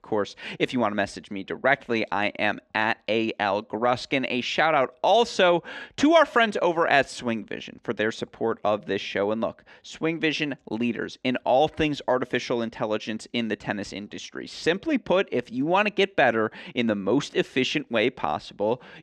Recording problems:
muffled; slightly; fading above 3 kHz

